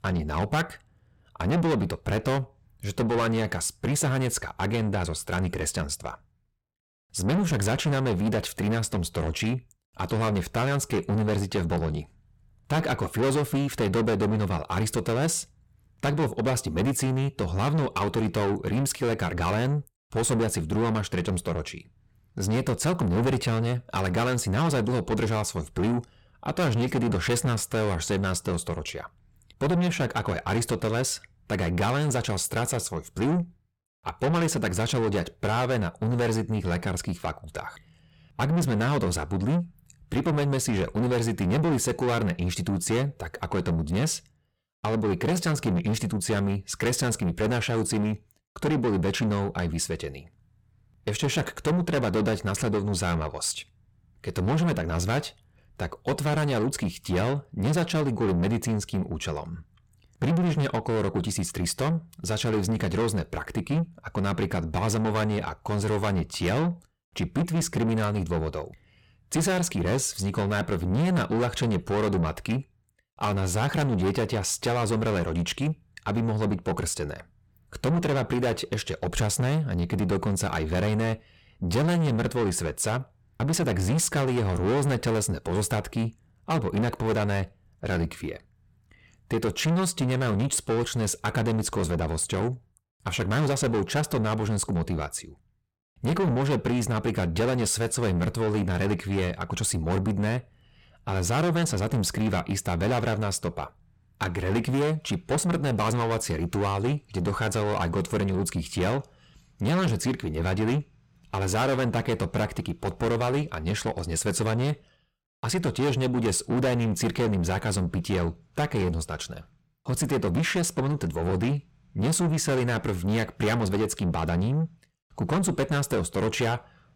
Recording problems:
distortion; heavy; 6 dB below the speech

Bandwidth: 17 kHz